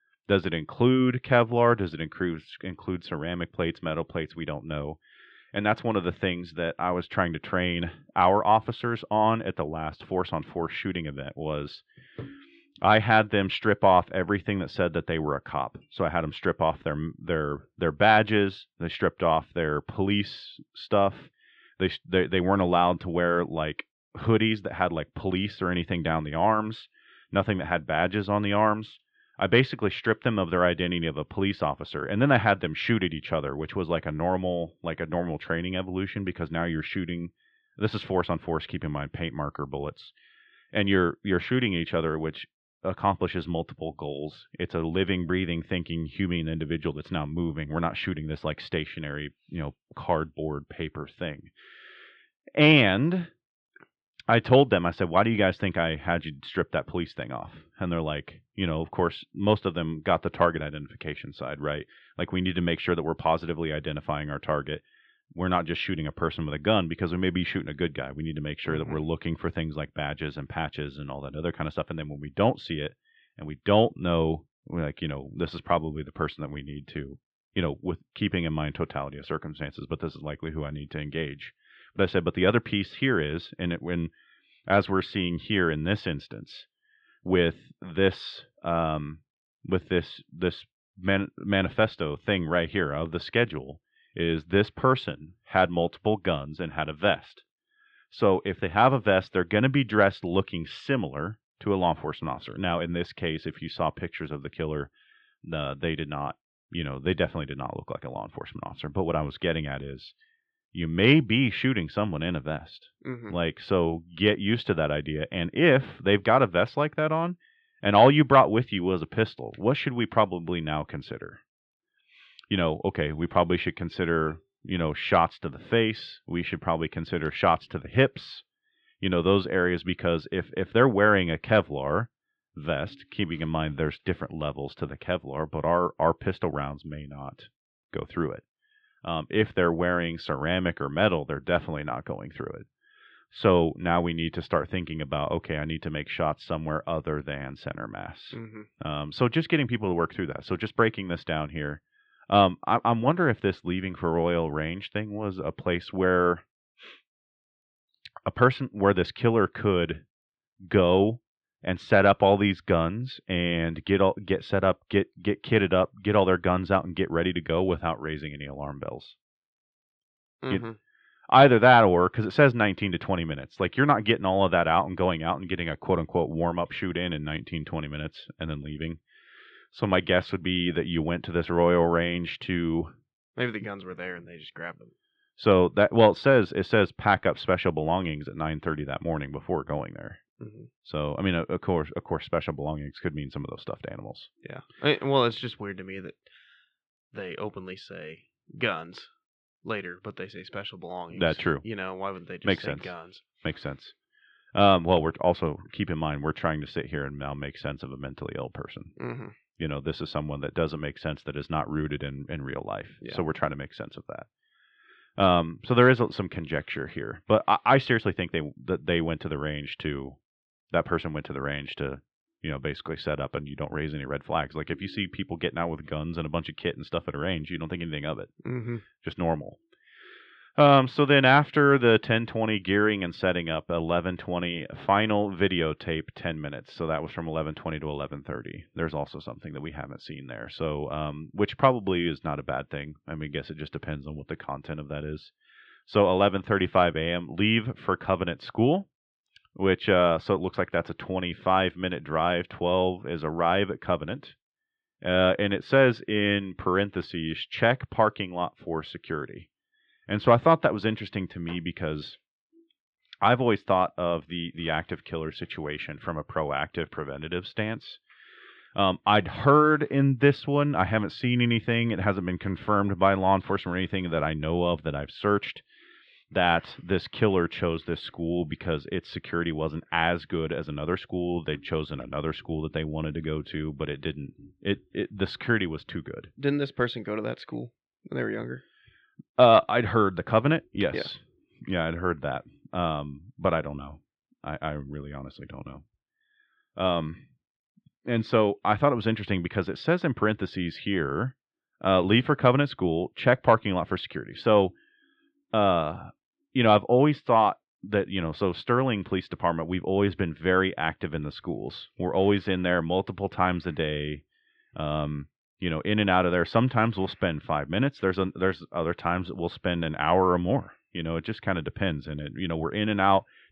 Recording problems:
muffled; slightly; fading above 3.5 kHz

